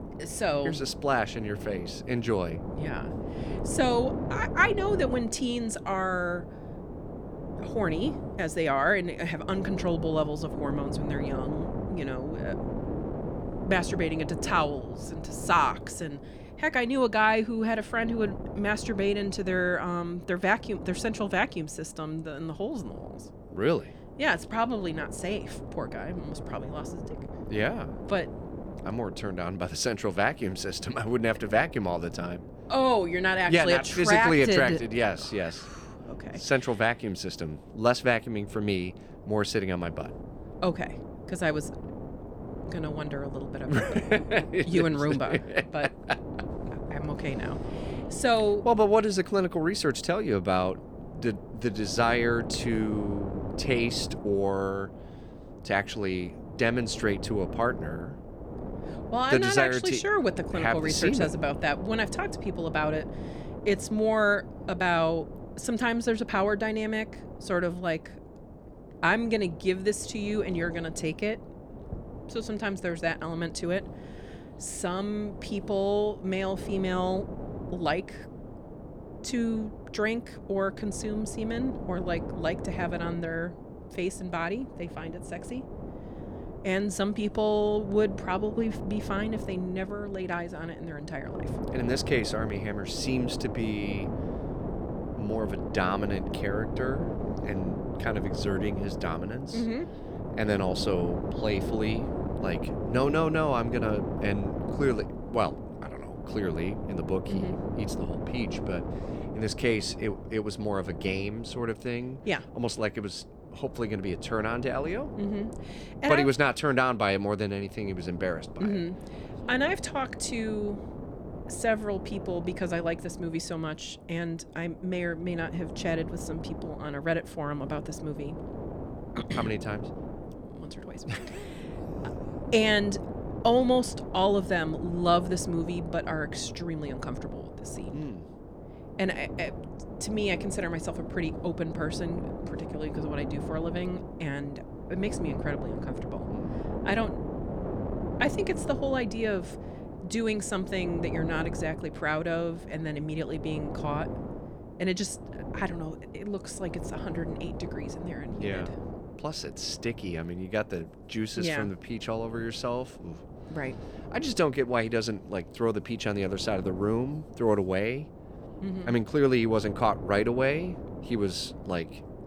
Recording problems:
wind noise on the microphone; occasional gusts; 10 dB below the speech

